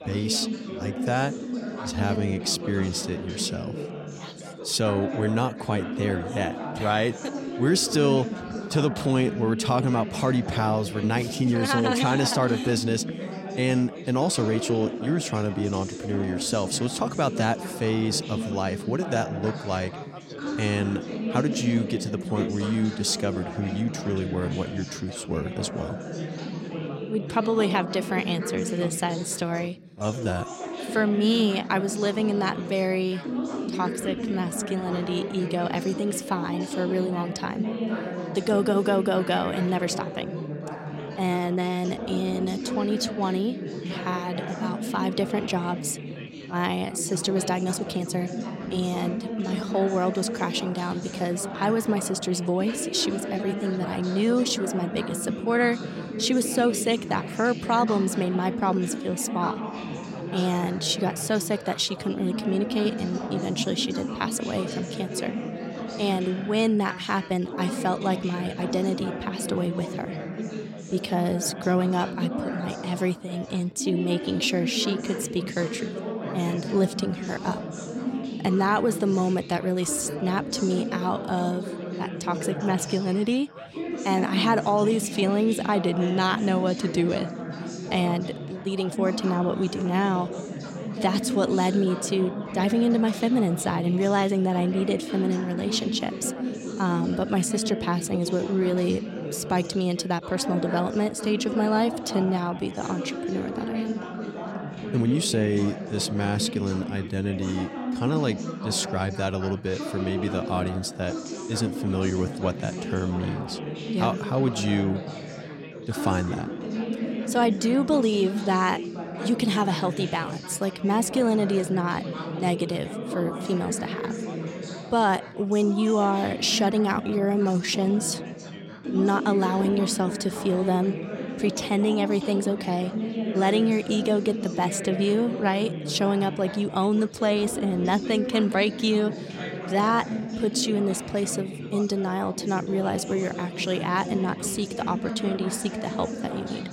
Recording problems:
background chatter; loud; throughout; 4 voices, 7 dB below the speech
uneven, jittery; strongly; from 2 s to 2:21

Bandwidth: 16 kHz